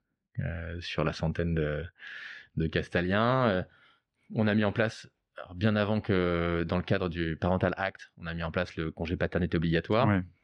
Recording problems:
muffled; slightly; fading above 3 kHz

